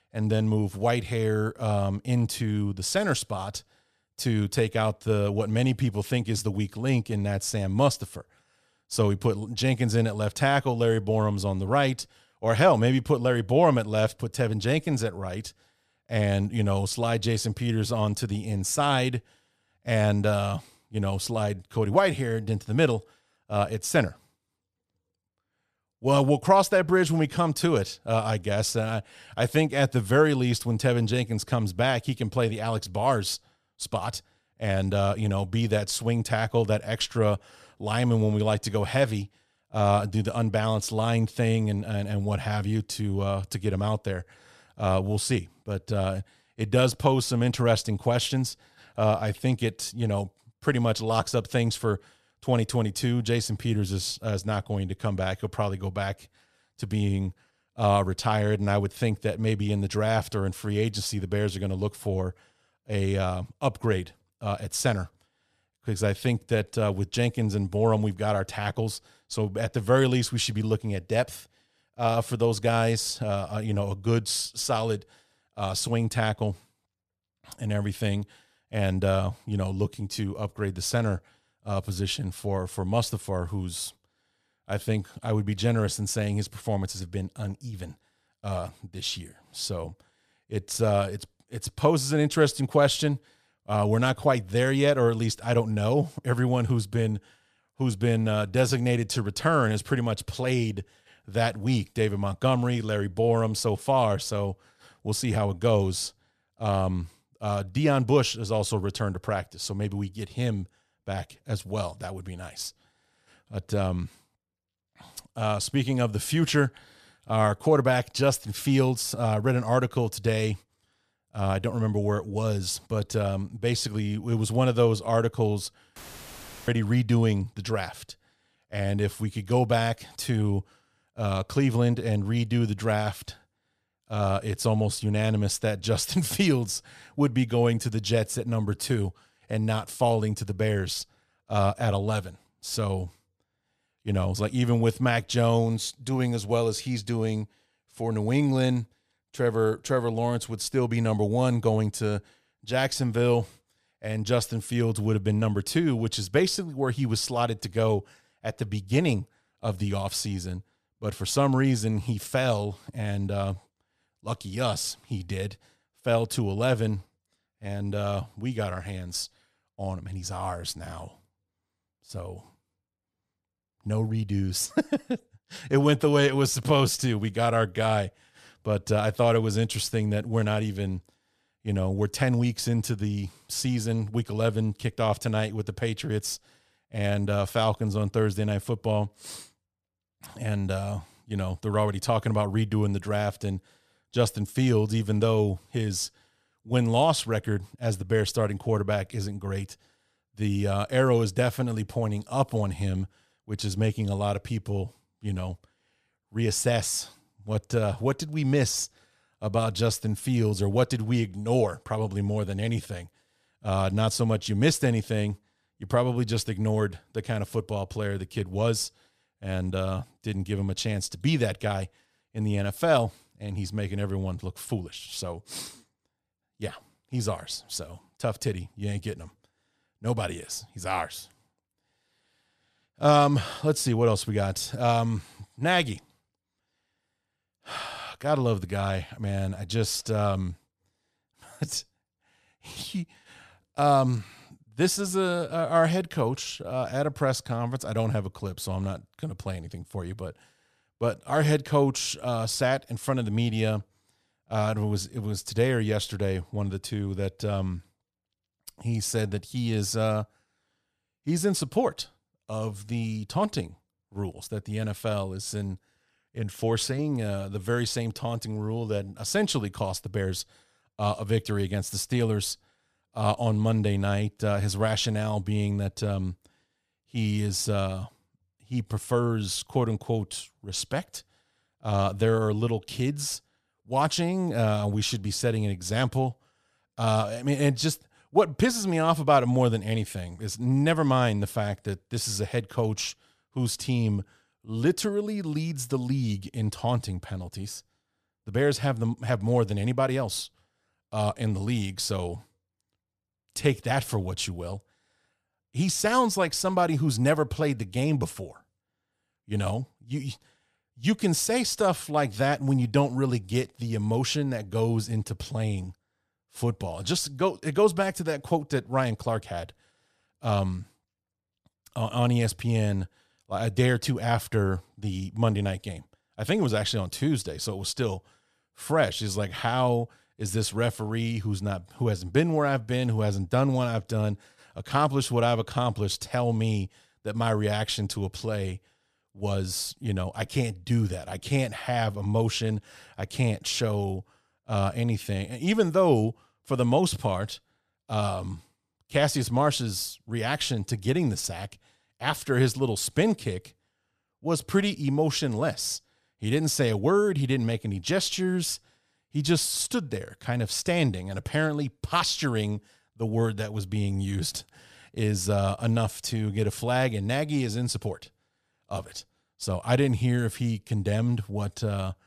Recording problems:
audio cutting out; filled with static; at 2:06 for 0.5 s

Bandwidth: 14.5 kHz